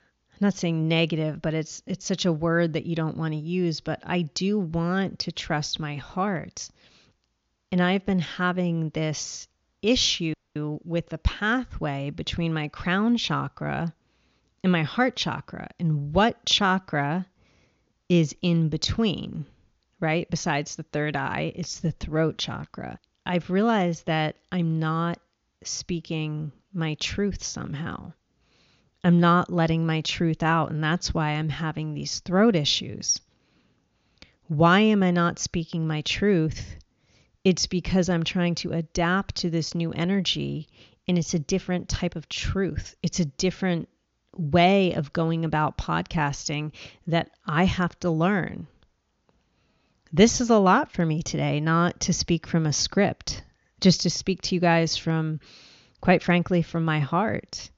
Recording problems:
high frequencies cut off; noticeable; nothing above 7 kHz
audio cutting out; at 10 s

